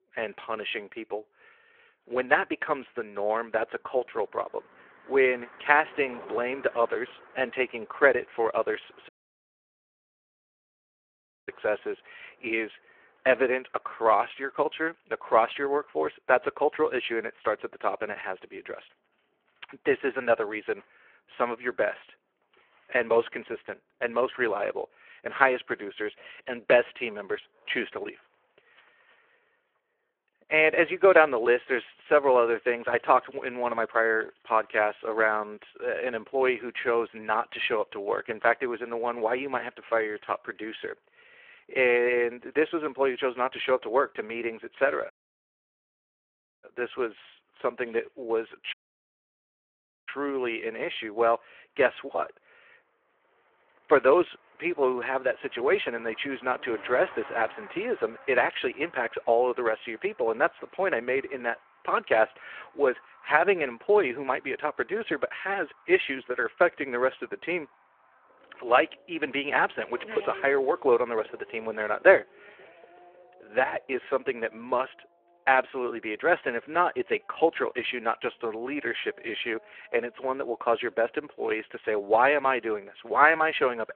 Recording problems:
phone-call audio
traffic noise; faint; throughout; 25 dB below the speech
audio cutting out; at 9 s for 2.5 s, at 45 s for 1.5 s and at 49 s for 1.5 s

